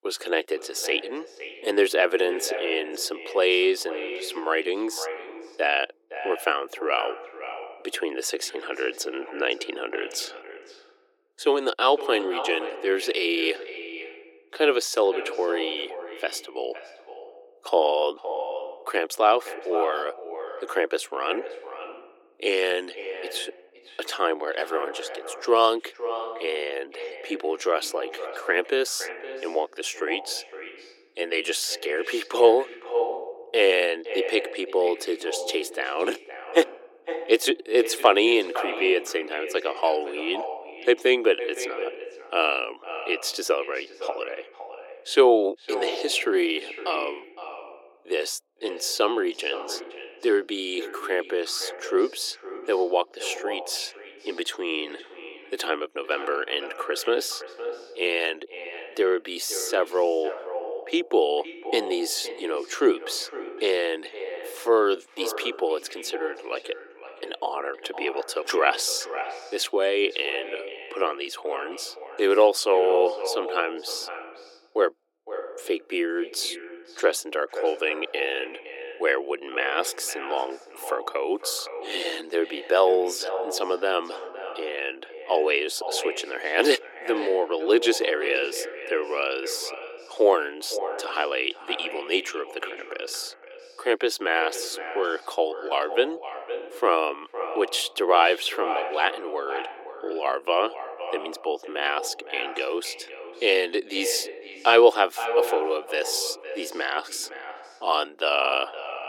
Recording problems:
echo of what is said; strong; throughout; 510 ms later, 10 dB below the speech
thin; very; fading below 350 Hz

